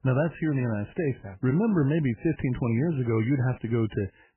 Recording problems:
garbled, watery; badly; nothing above 3 kHz

